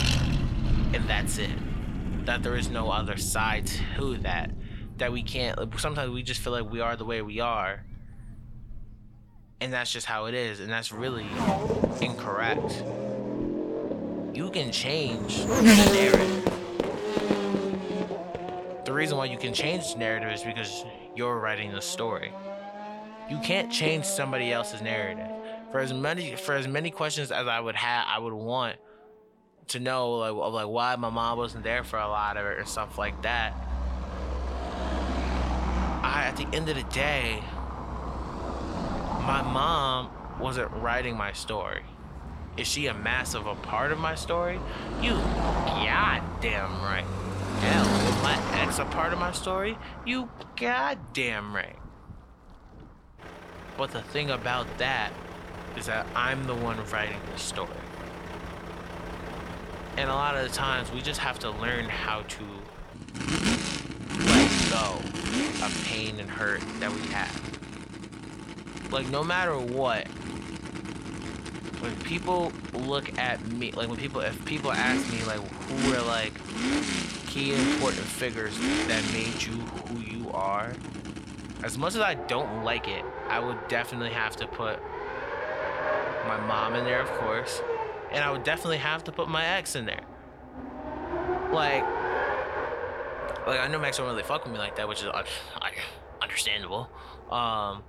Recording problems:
traffic noise; loud; throughout; 2 dB below the speech

